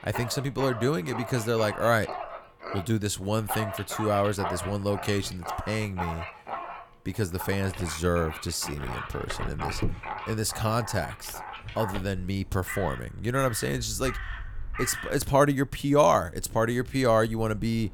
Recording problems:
animal sounds; loud; throughout; 10 dB below the speech

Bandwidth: 17.5 kHz